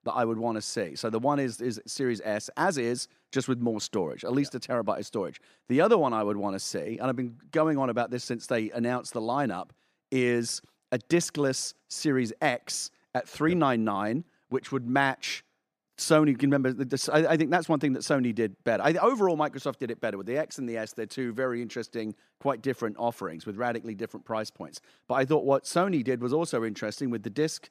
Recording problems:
none

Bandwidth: 14.5 kHz